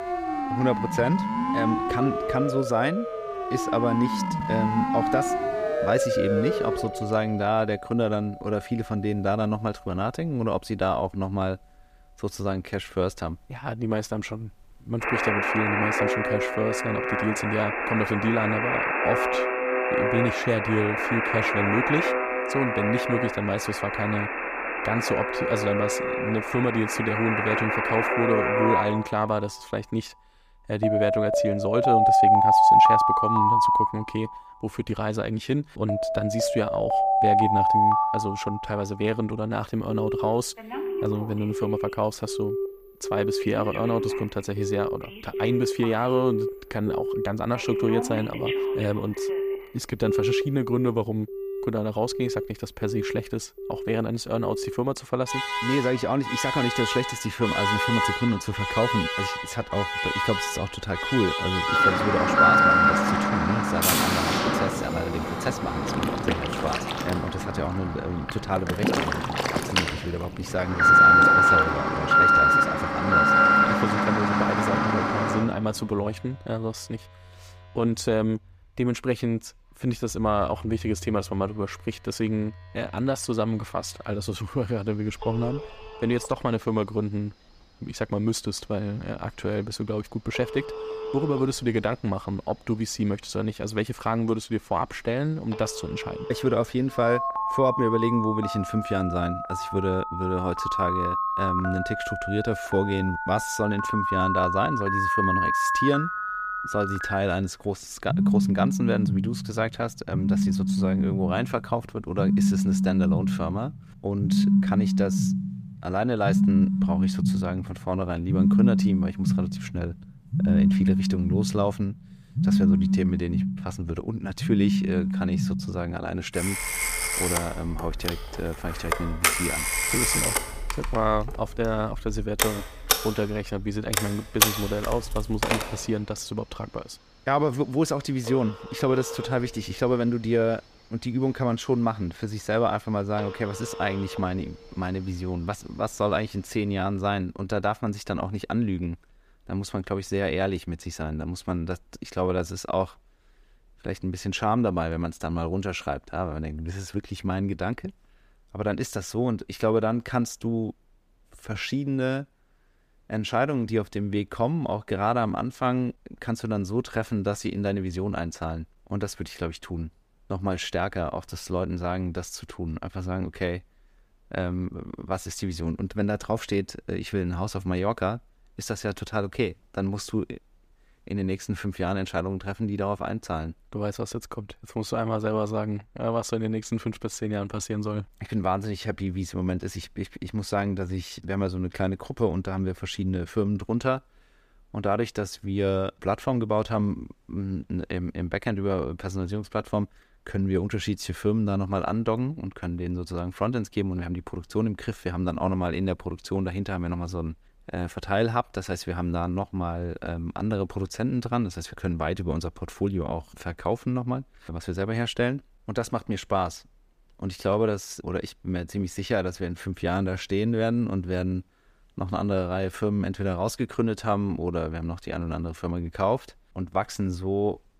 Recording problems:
alarms or sirens; very loud; until 2:27; 4 dB above the speech

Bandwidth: 15 kHz